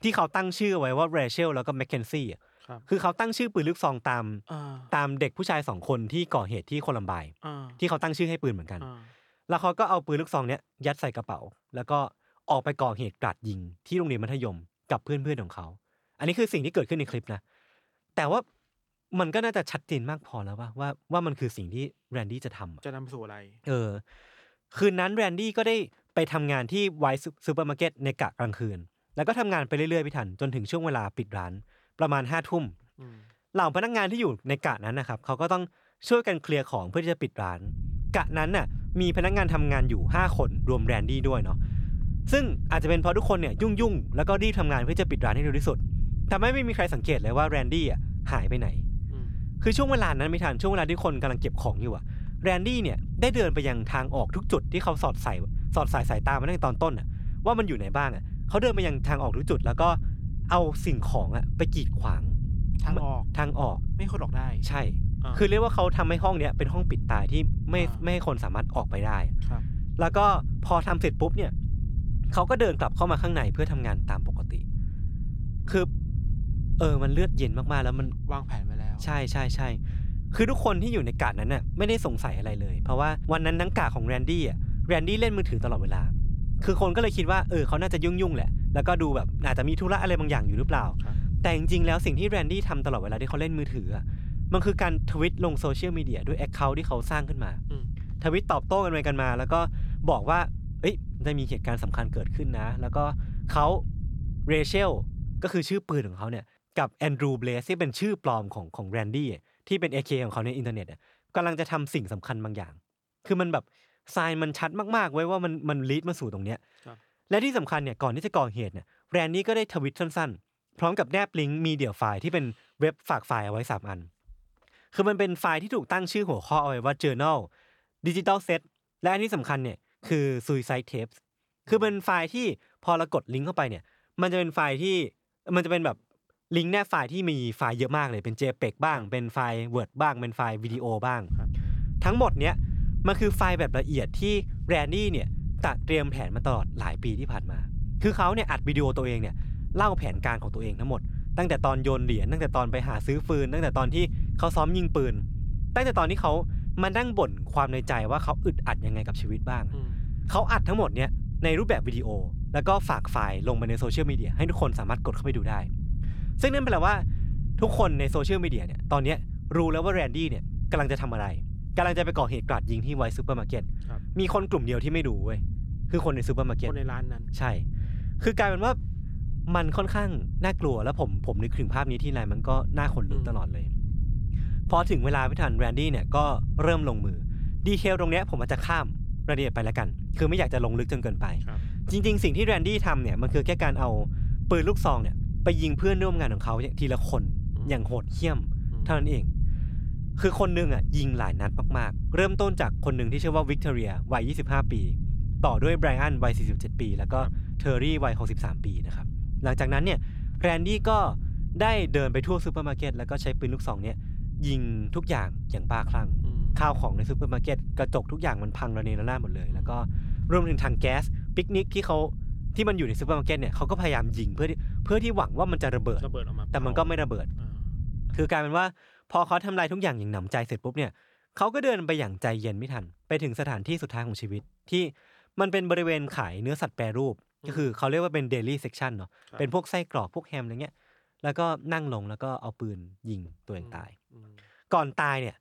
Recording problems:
low rumble; noticeable; from 38 s to 1:45 and from 2:21 to 3:48; 20 dB below the speech

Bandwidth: 18.5 kHz